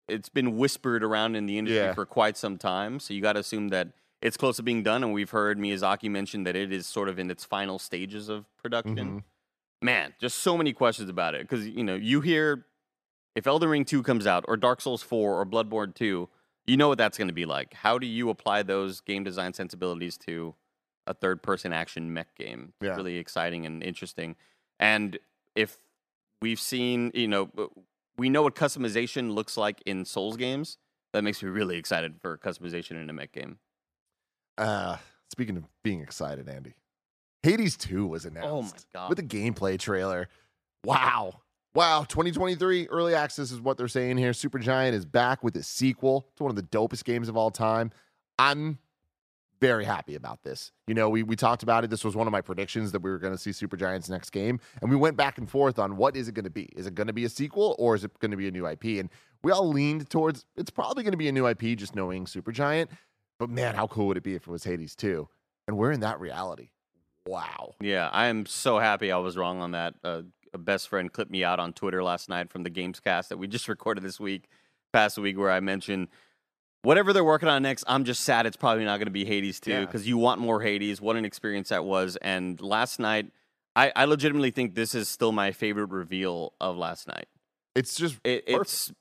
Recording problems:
none

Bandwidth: 14.5 kHz